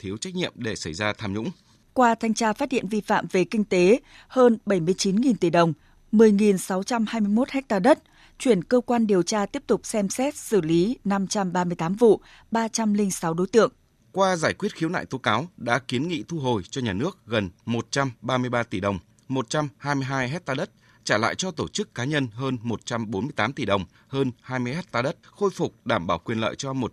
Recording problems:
none

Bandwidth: 13.5 kHz